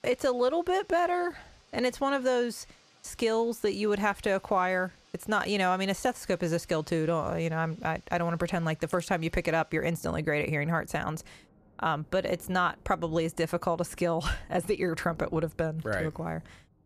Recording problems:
rain or running water; faint; throughout; 30 dB below the speech

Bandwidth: 14.5 kHz